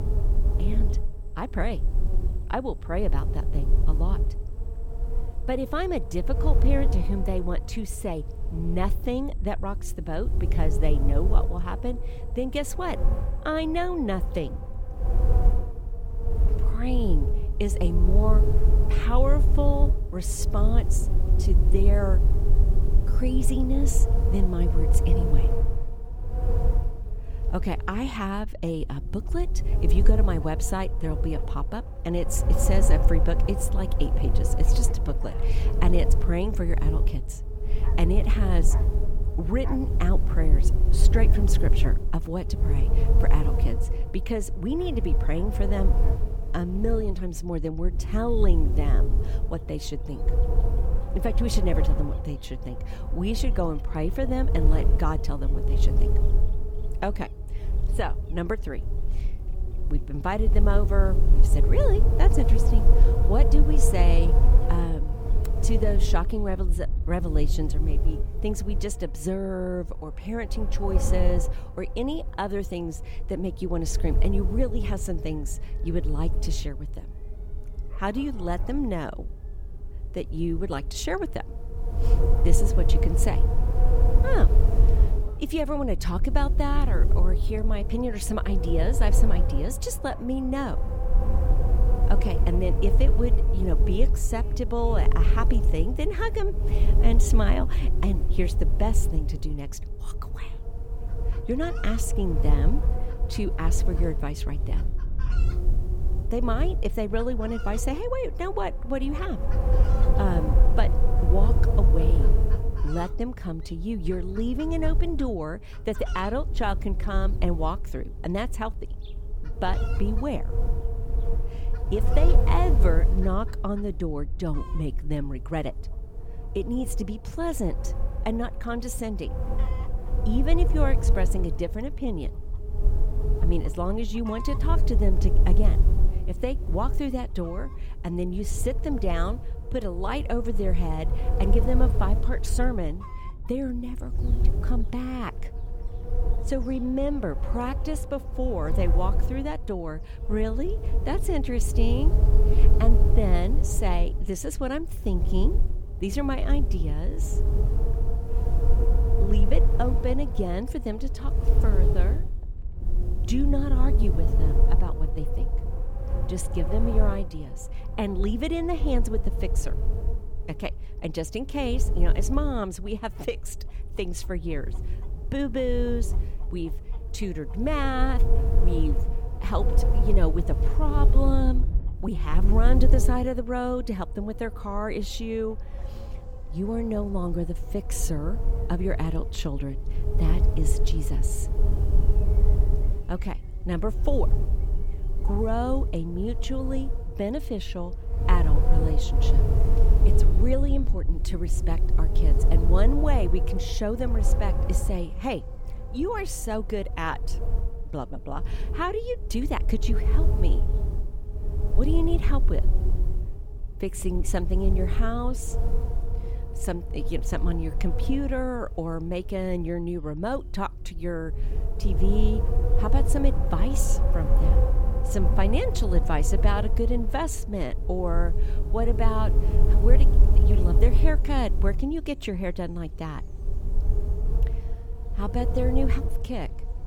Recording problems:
wind noise on the microphone; heavy; 7 dB below the speech
animal sounds; faint; throughout; 25 dB below the speech

